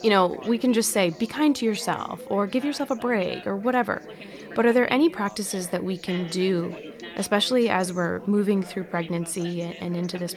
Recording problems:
background chatter; noticeable; throughout; 4 voices, 15 dB below the speech

